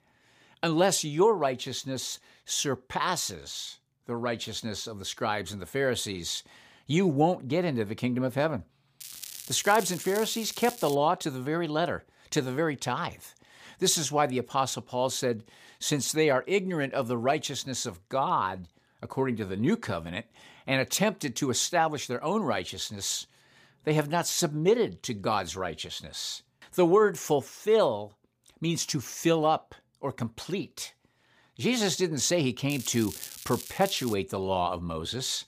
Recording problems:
crackling; noticeable; from 9 to 11 s and from 33 to 34 s; 10 dB below the speech

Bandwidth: 15 kHz